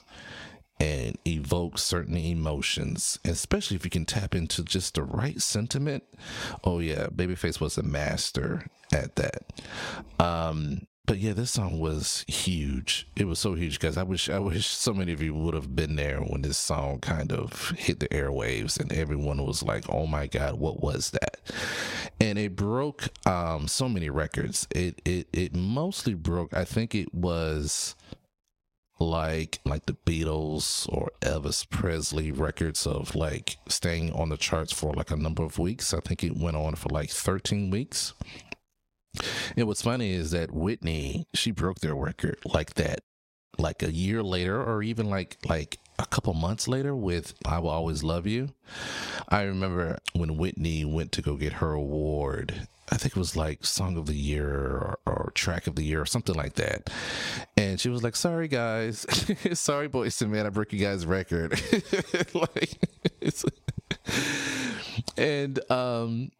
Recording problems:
squashed, flat; heavily

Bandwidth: 16 kHz